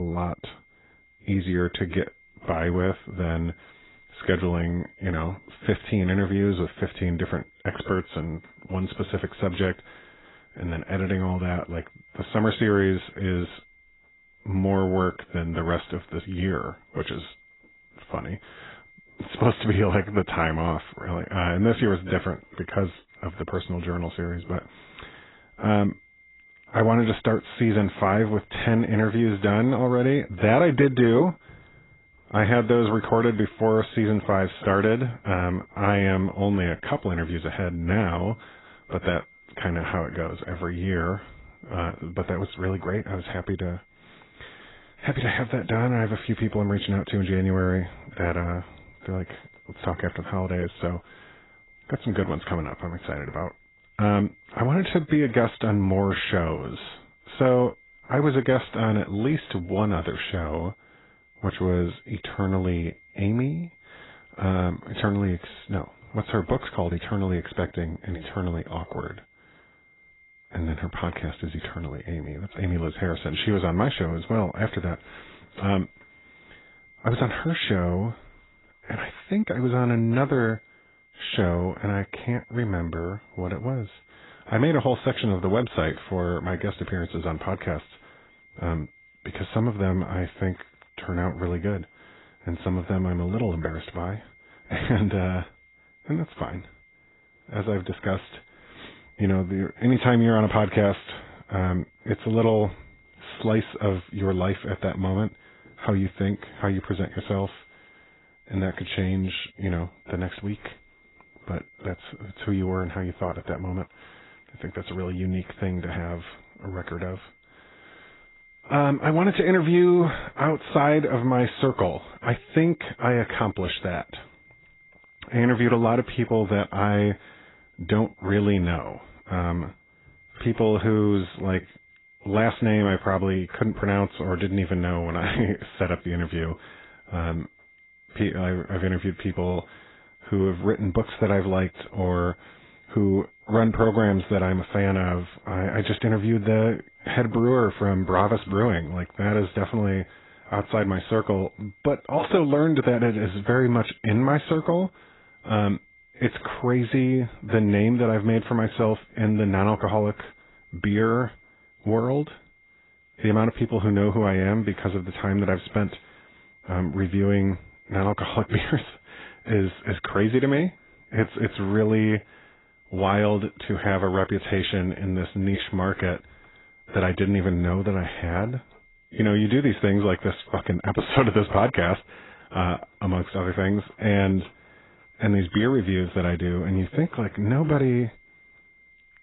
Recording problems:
garbled, watery; badly; nothing above 4 kHz
high-pitched whine; faint; throughout; 2 kHz, 30 dB below the speech
abrupt cut into speech; at the start

